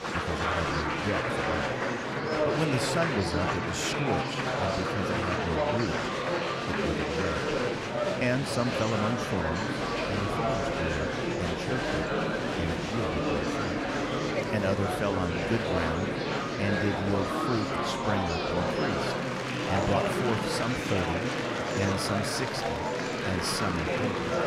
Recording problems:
murmuring crowd; very loud; throughout; 4 dB above the speech

